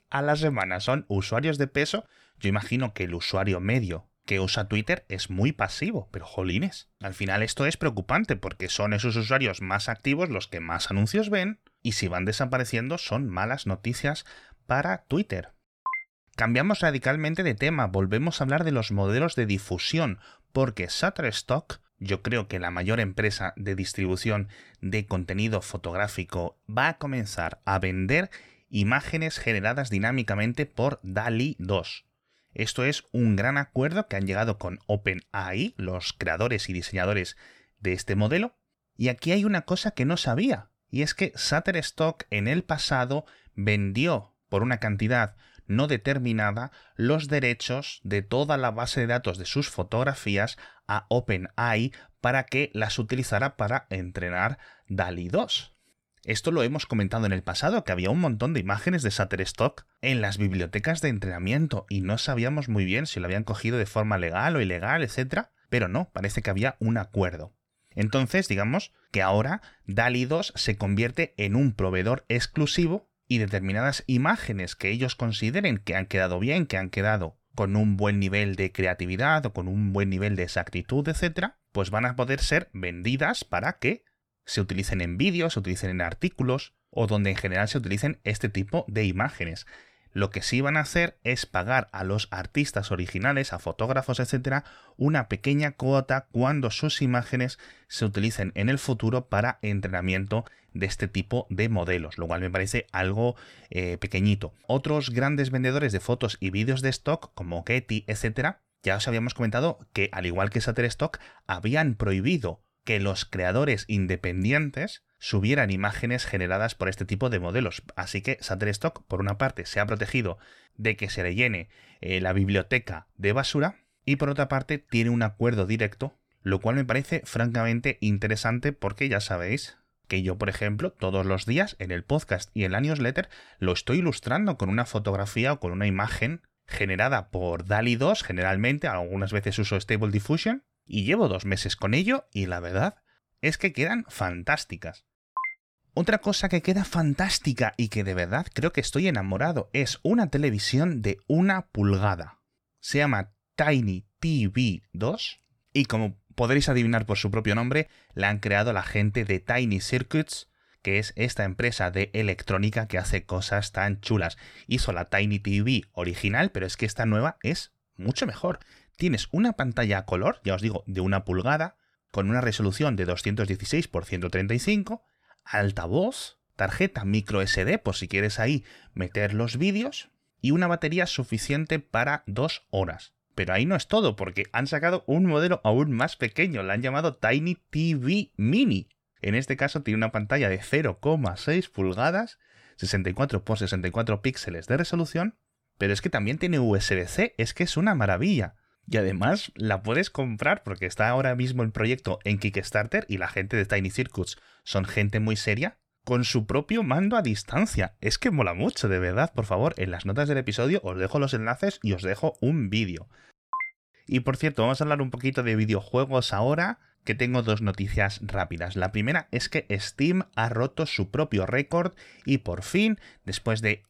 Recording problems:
none

